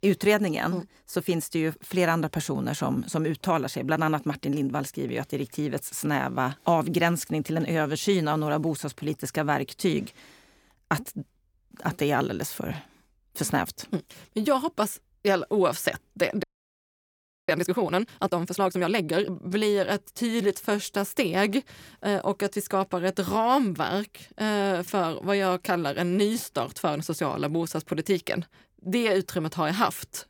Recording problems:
audio freezing; at 16 s for 1 s

